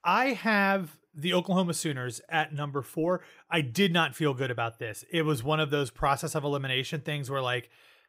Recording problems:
none

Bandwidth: 15.5 kHz